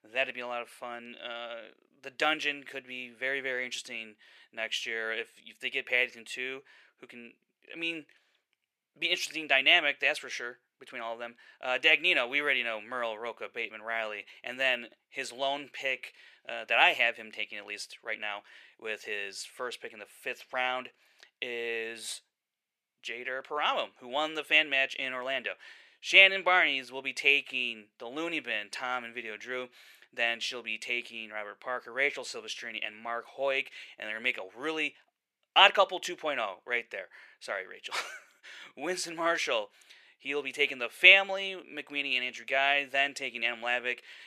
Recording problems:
thin; very; fading below 550 Hz

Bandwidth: 14.5 kHz